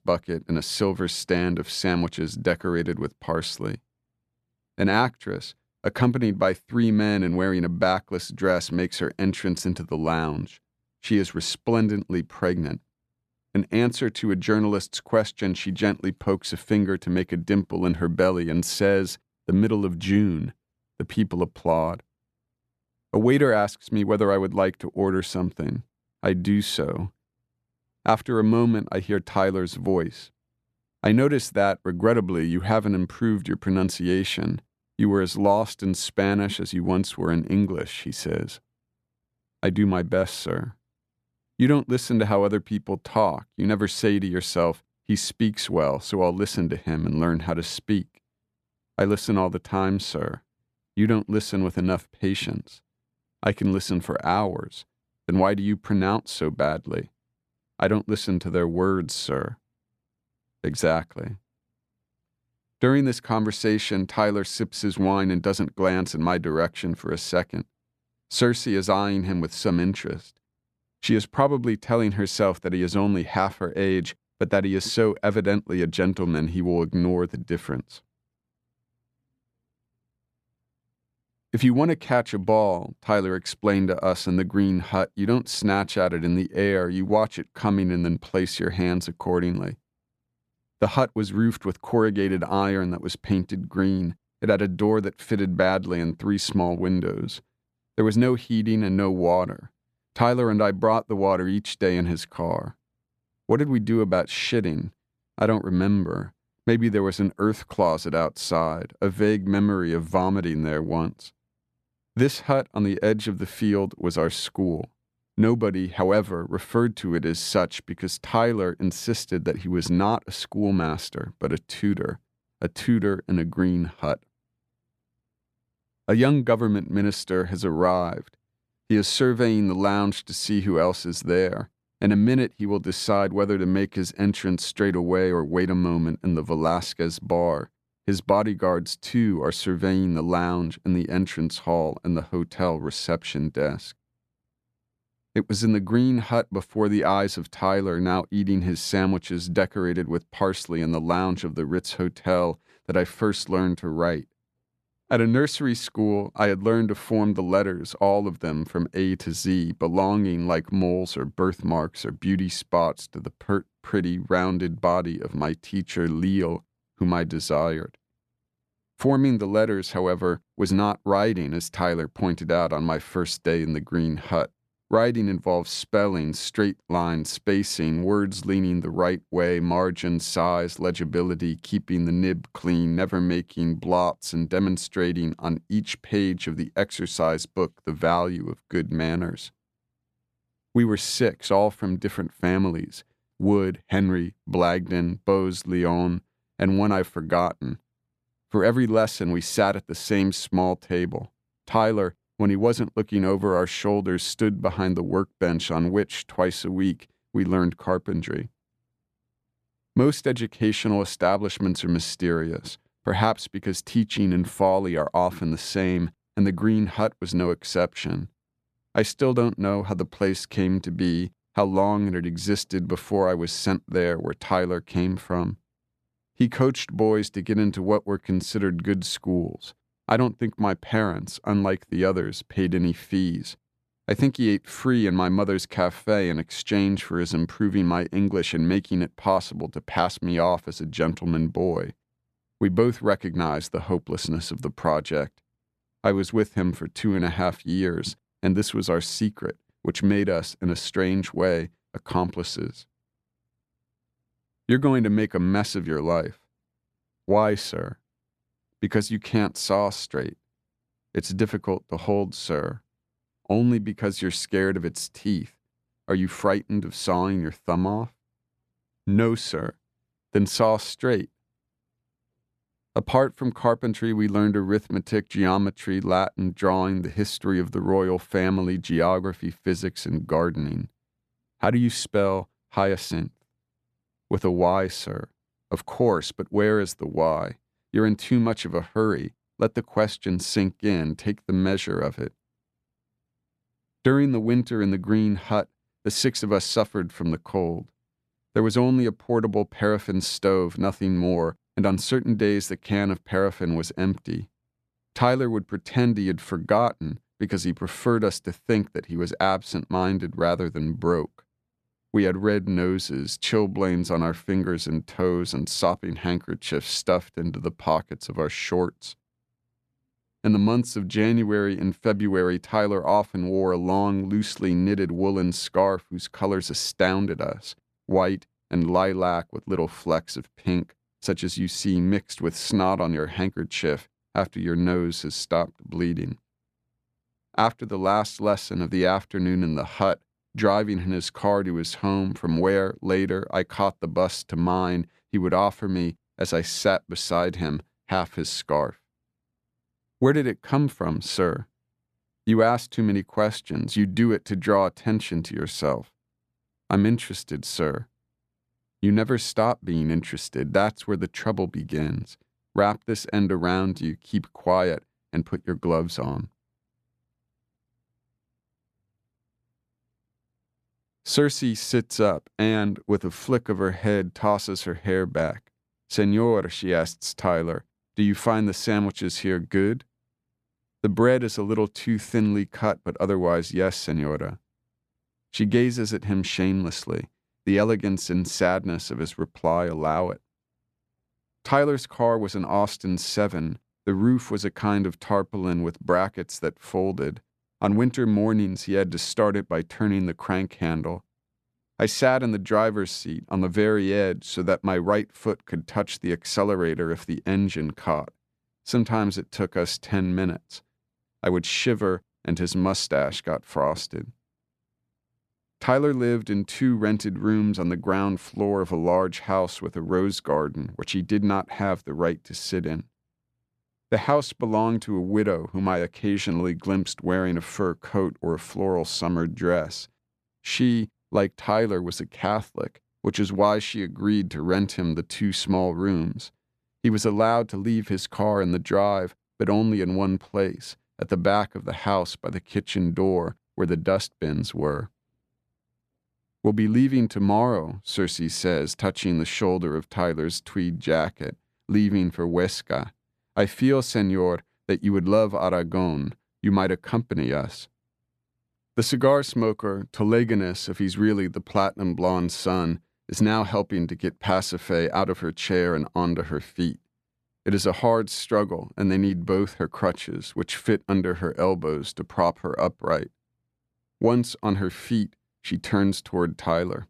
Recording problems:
none

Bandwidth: 14 kHz